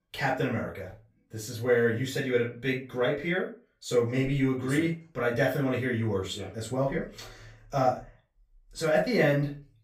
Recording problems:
off-mic speech; far
room echo; slight; dies away in 0.3 s

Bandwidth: 15.5 kHz